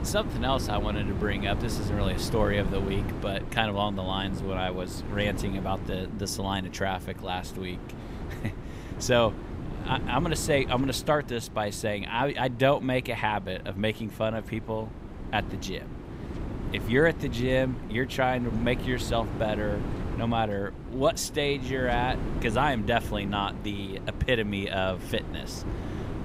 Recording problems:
wind noise on the microphone; occasional gusts; 15 dB below the speech

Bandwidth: 15.5 kHz